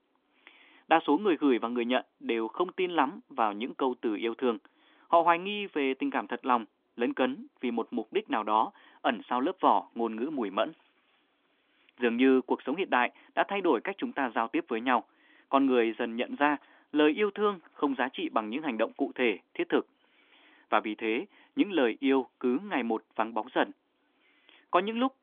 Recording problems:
phone-call audio; nothing above 3.5 kHz

